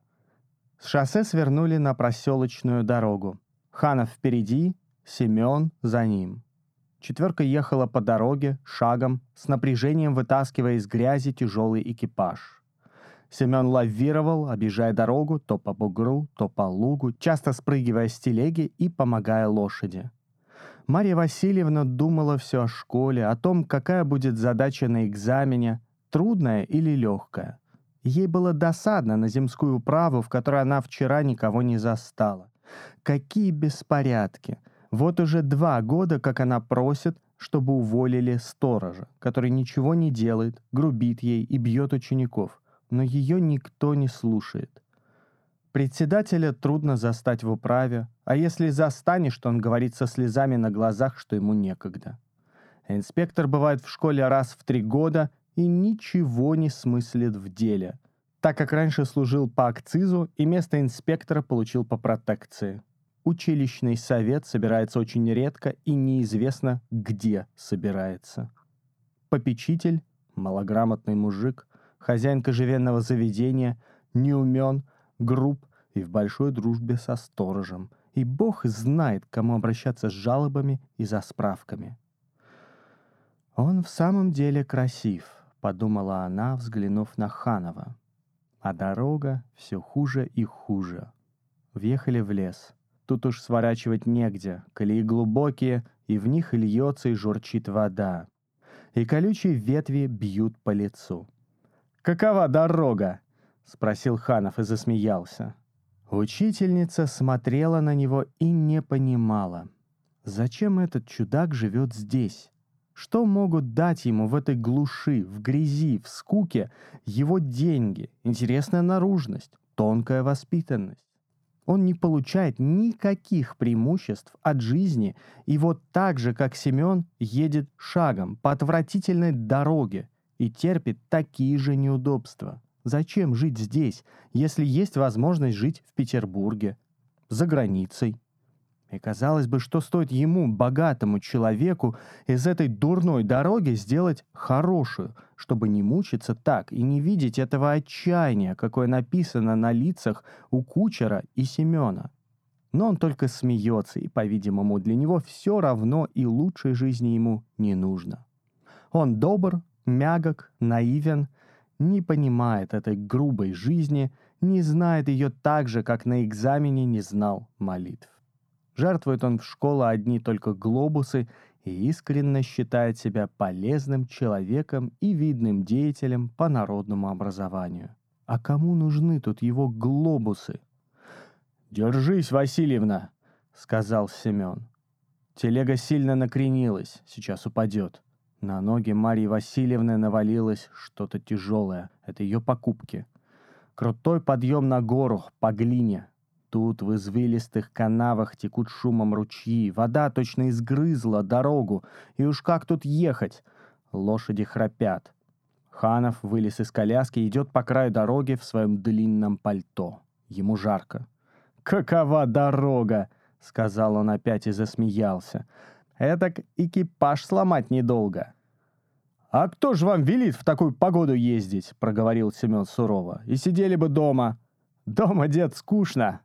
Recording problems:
muffled; slightly; fading above 2 kHz

